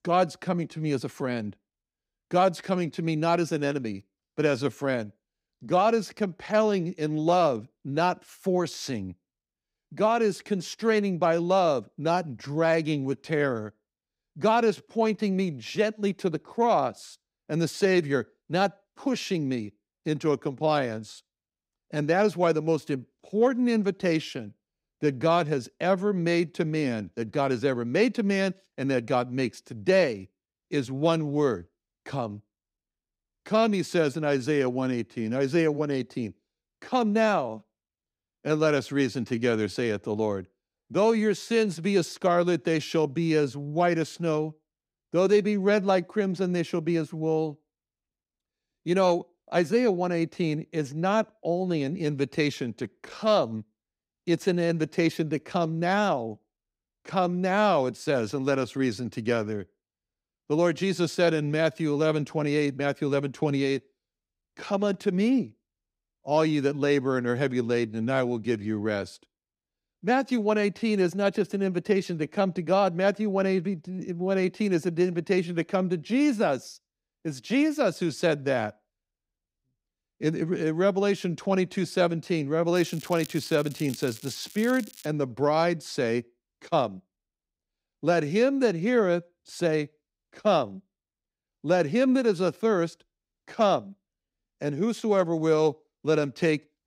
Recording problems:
crackling; noticeable; from 1:23 to 1:25; 20 dB below the speech

